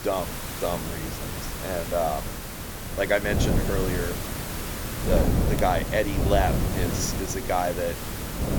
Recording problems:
wind noise on the microphone; heavy; 9 dB below the speech
hiss; loud; throughout; 6 dB below the speech

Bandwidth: 18.5 kHz